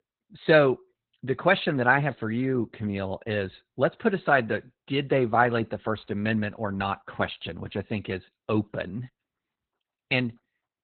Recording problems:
garbled, watery; badly; nothing above 4 kHz

